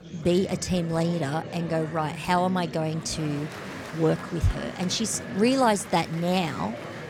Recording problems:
murmuring crowd; noticeable; throughout; 10 dB below the speech

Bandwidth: 17 kHz